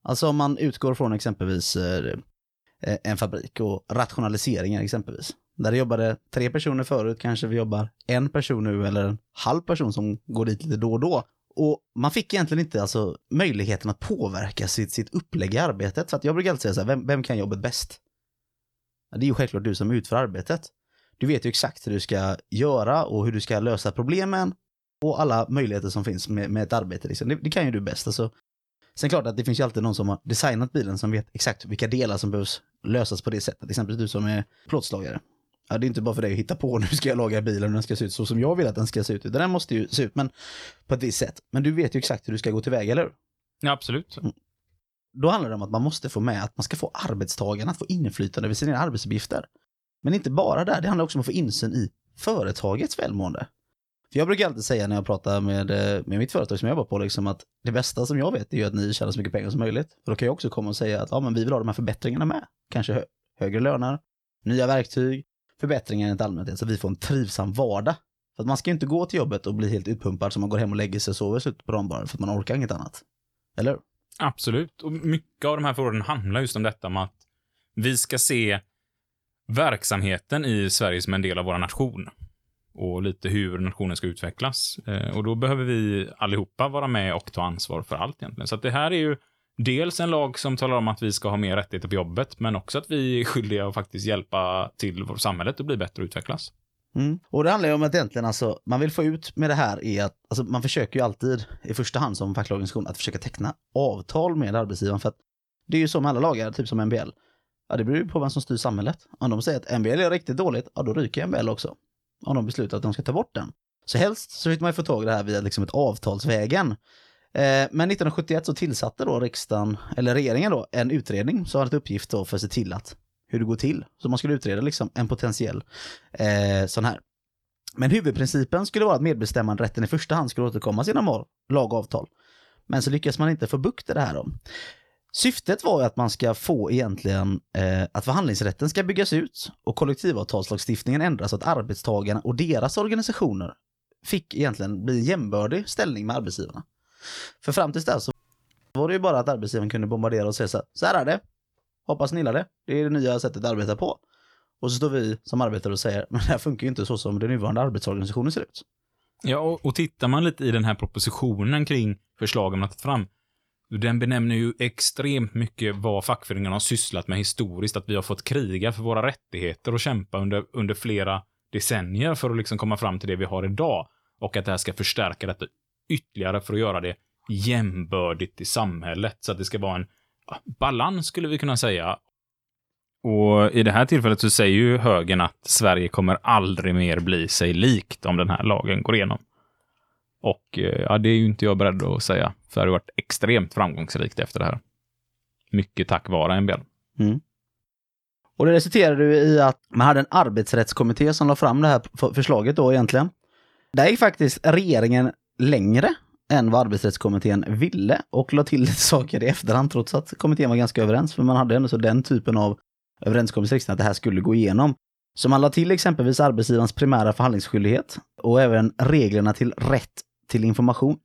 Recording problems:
none

